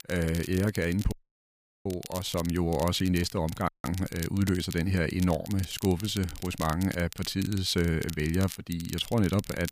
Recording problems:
crackle, like an old record; noticeable; 15 dB below the speech
audio cutting out; at 1 s for 0.5 s and at 3.5 s

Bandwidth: 15 kHz